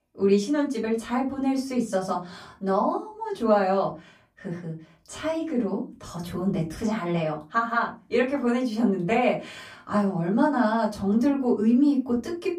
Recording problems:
off-mic speech; far
room echo; very slight; dies away in 0.3 s

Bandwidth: 15 kHz